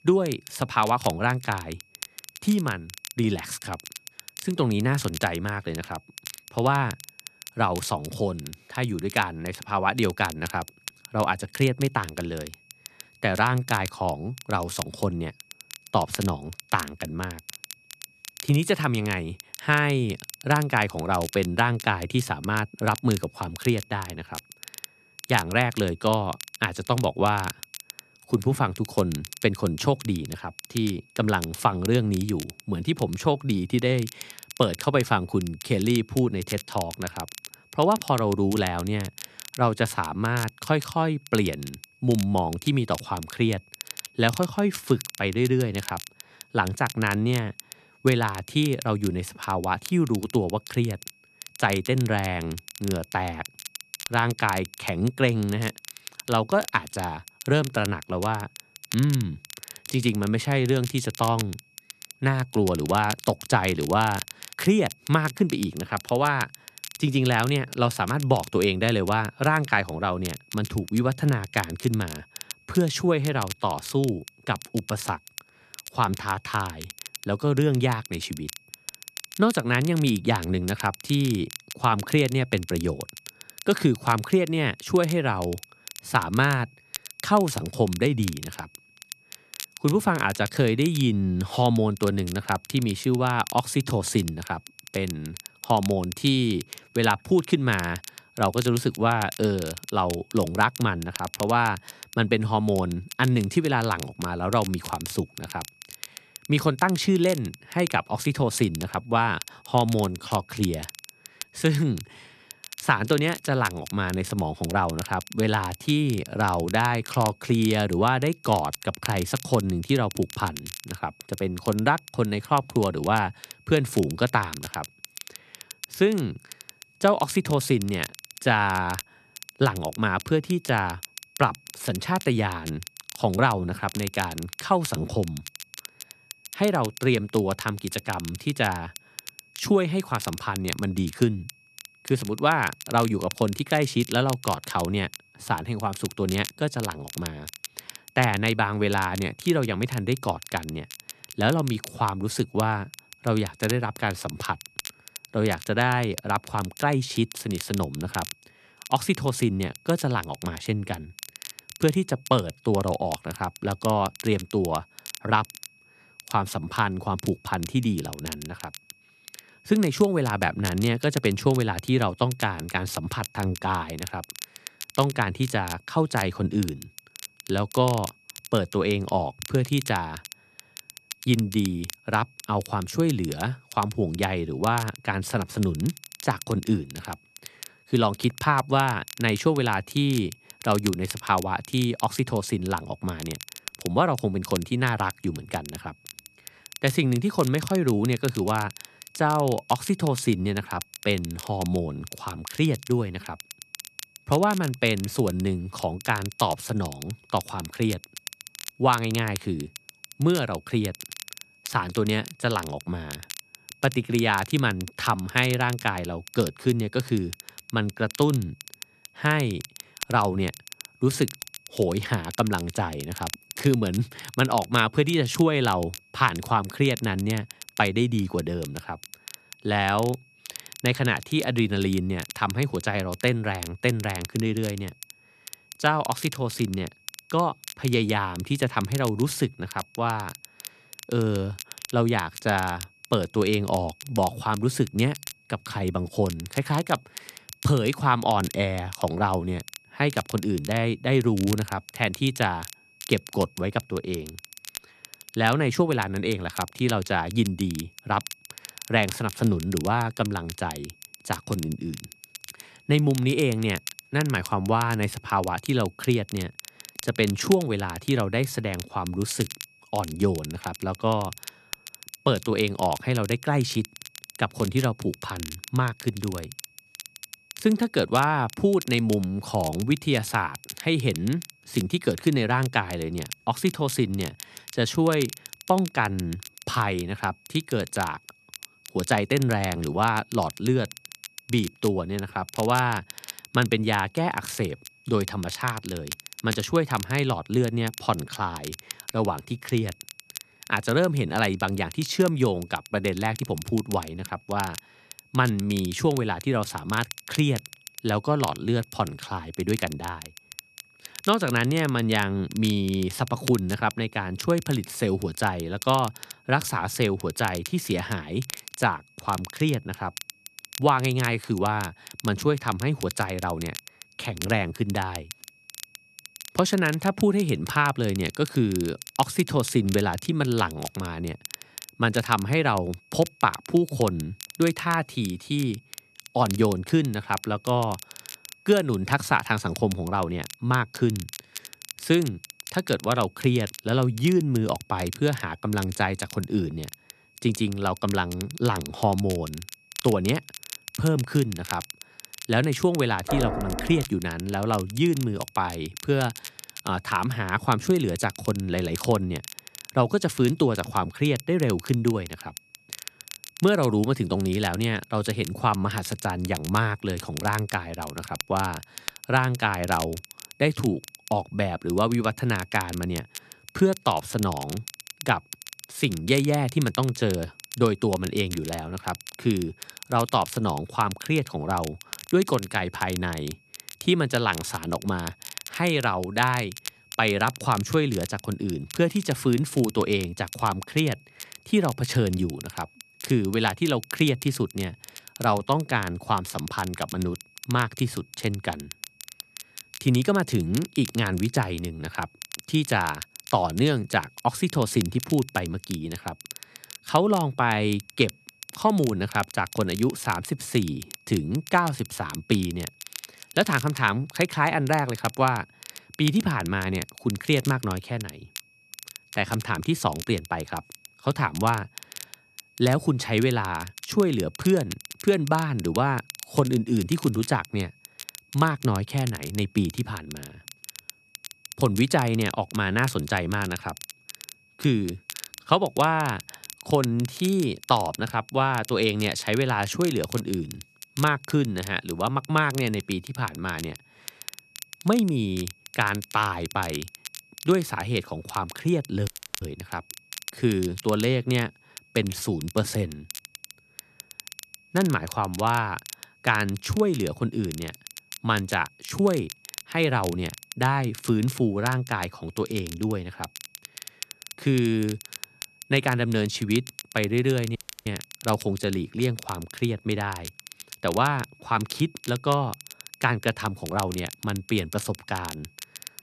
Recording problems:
crackle, like an old record; noticeable; 15 dB below the speech
high-pitched whine; faint; throughout; 2.5 kHz, 30 dB below the speech
door banging; noticeable; at 5:53; peak 3 dB below the speech
audio cutting out; at 7:29 and at 7:48

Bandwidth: 14 kHz